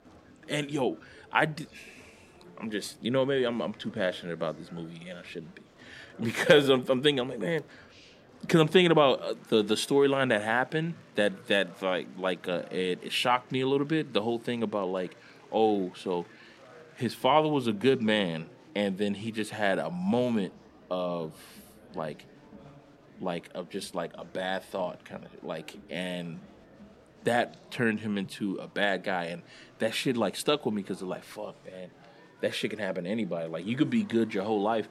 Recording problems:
murmuring crowd; faint; throughout; 25 dB below the speech

